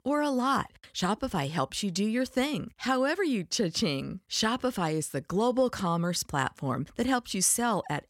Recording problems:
none

